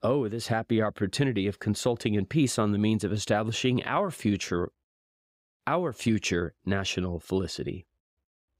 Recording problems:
none

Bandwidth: 15.5 kHz